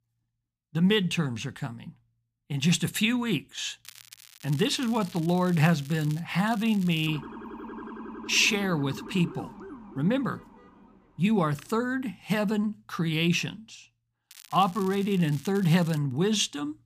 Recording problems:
crackling; faint; from 4 to 6 s, at 6.5 s and from 14 to 16 s; 20 dB below the speech
siren; faint; from 7 to 11 s; peak 15 dB below the speech

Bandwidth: 15 kHz